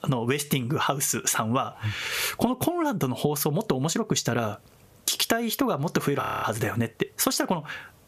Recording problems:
squashed, flat; heavily
audio freezing; at 6 s

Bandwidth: 14.5 kHz